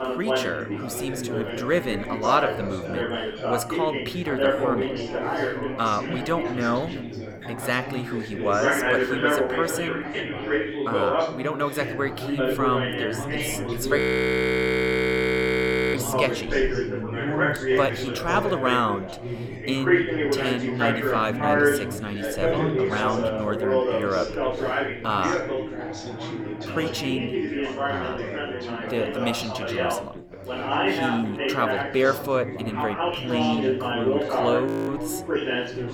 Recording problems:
chatter from many people; very loud; throughout; 1 dB above the speech
audio freezing; at 14 s for 2 s and at 35 s

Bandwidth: 18 kHz